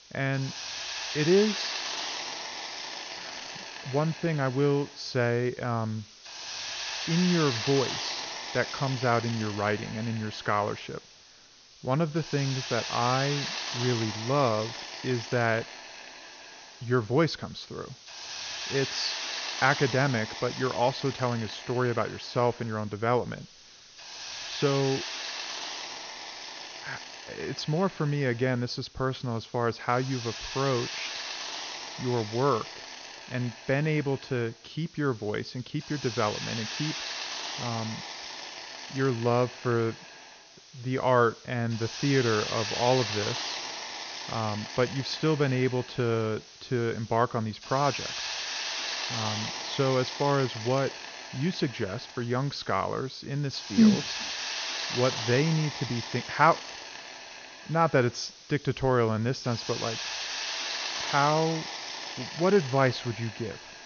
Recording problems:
high frequencies cut off; noticeable; nothing above 6.5 kHz
hiss; loud; throughout; 6 dB below the speech

